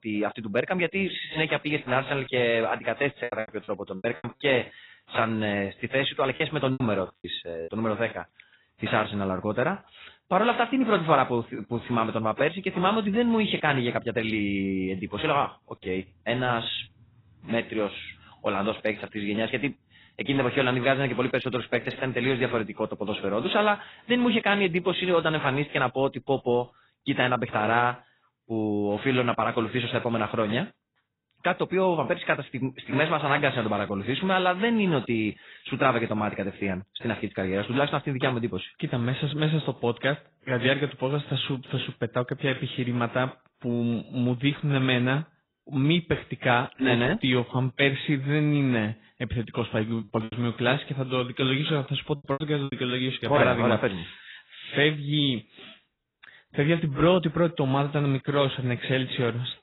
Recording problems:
garbled, watery; badly; nothing above 4 kHz
choppy; very; from 3 to 7.5 s and from 50 to 53 s; 12% of the speech affected

